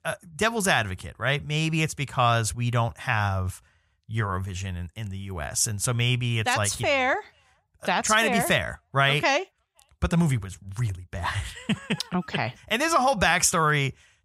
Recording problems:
none

